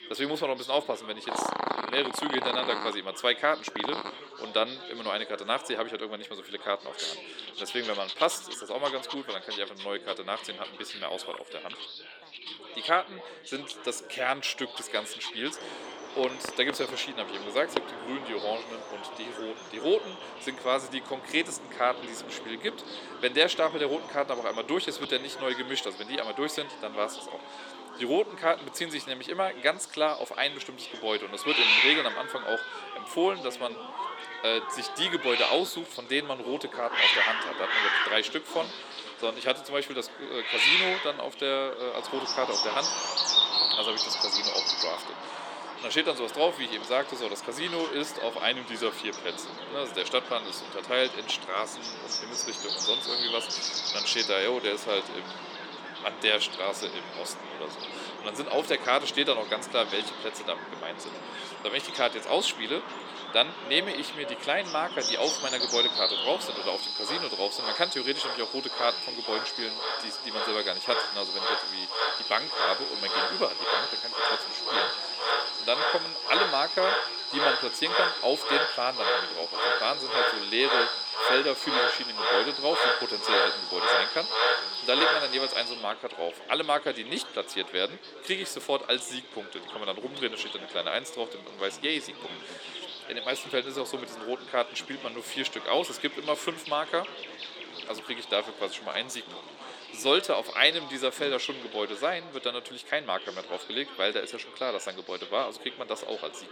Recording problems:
thin; somewhat; fading below 350 Hz
animal sounds; very loud; throughout; 1 dB above the speech
background chatter; noticeable; throughout; 4 voices, 15 dB below the speech

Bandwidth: 17 kHz